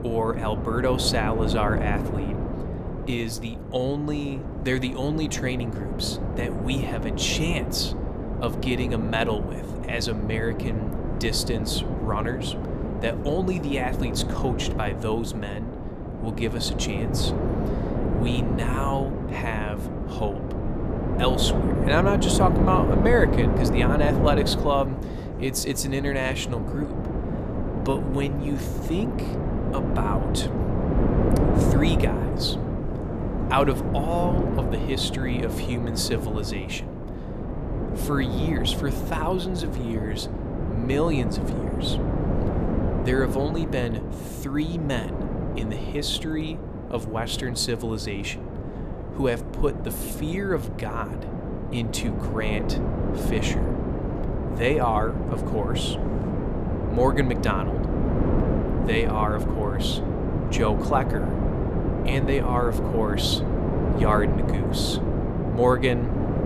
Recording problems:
wind noise on the microphone; heavy; 4 dB below the speech

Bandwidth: 14.5 kHz